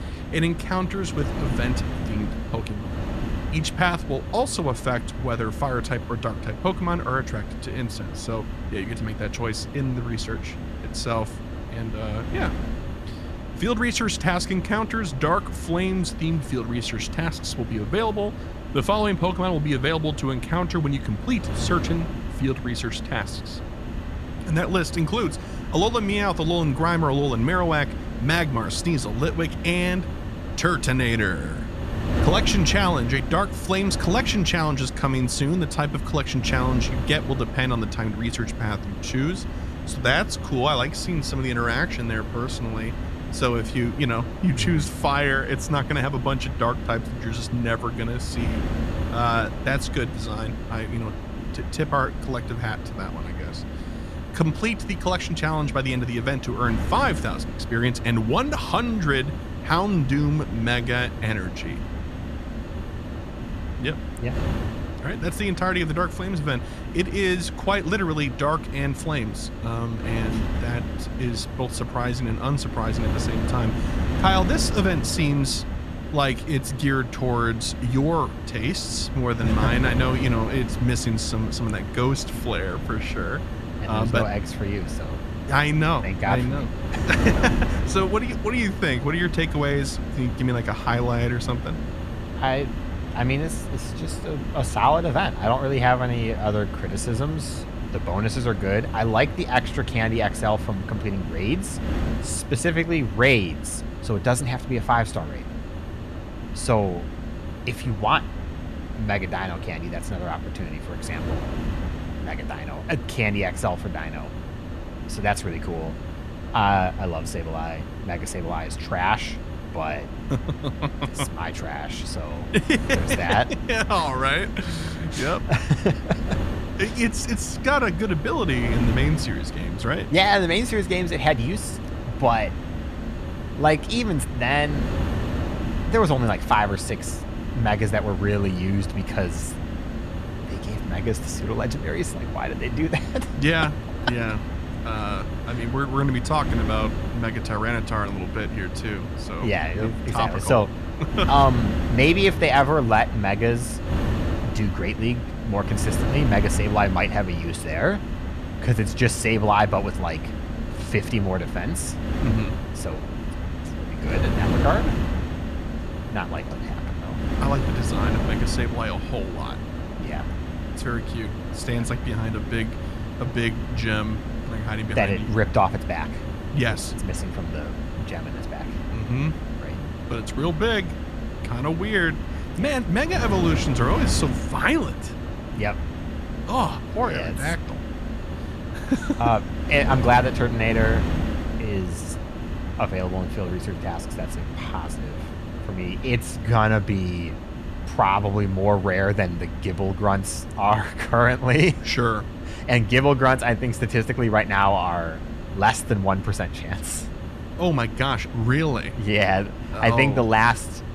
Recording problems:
wind noise on the microphone; occasional gusts; 10 dB below the speech

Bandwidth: 13.5 kHz